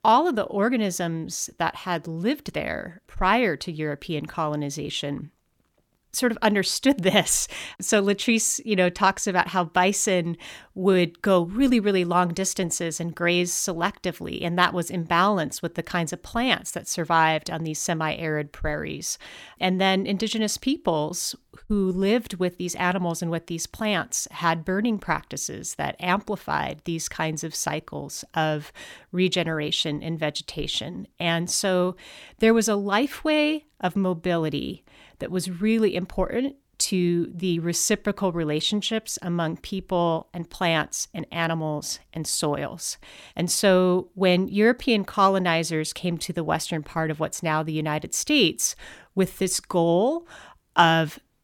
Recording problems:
none

